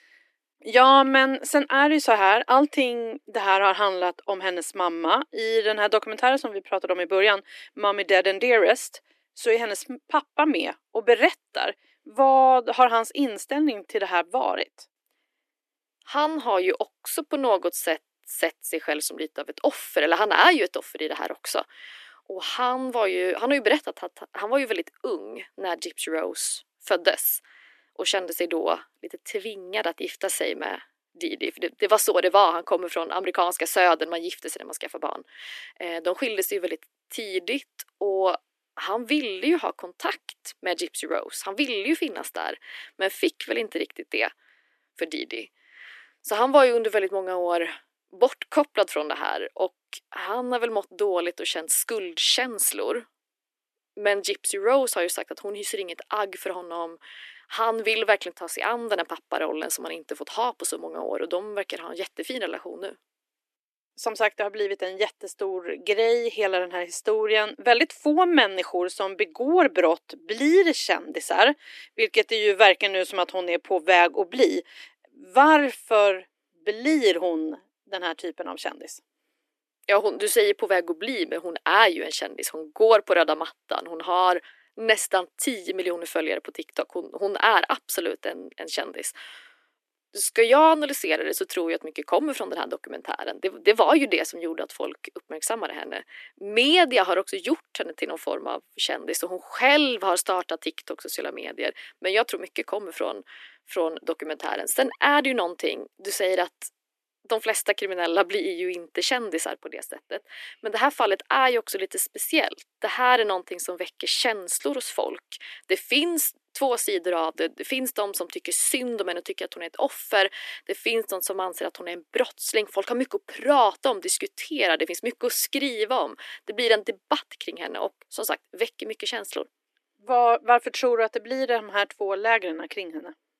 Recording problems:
thin; somewhat; fading below 300 Hz

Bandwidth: 13.5 kHz